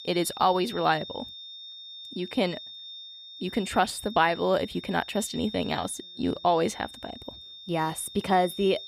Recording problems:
high-pitched whine; noticeable; throughout; 3.5 kHz, 15 dB below the speech

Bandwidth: 15 kHz